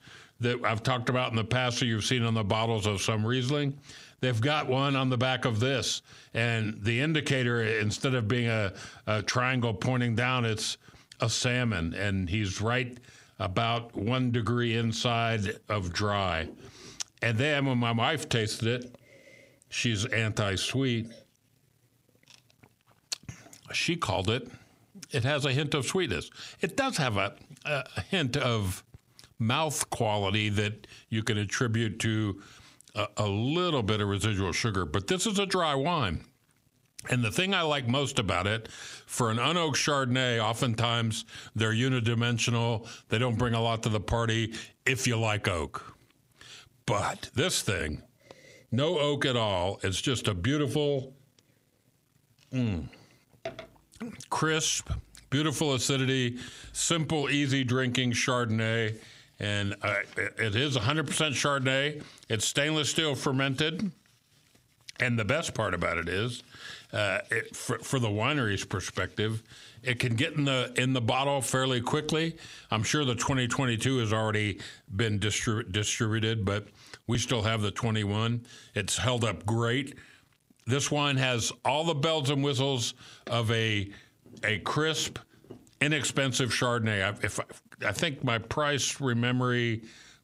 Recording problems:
squashed, flat; heavily

